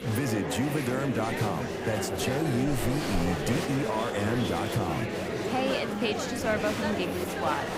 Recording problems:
murmuring crowd; loud; throughout; 1 dB below the speech

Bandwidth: 15.5 kHz